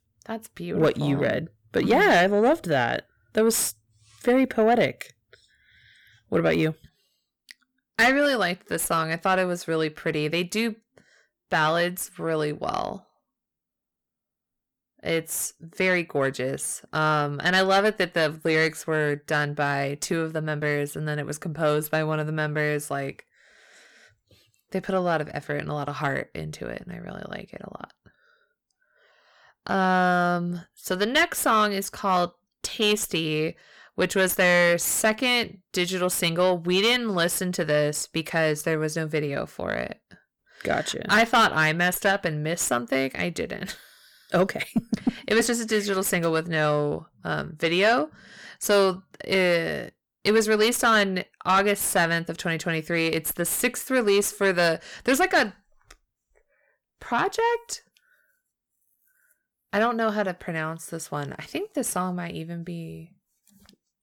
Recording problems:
distortion; slight; 10 dB below the speech

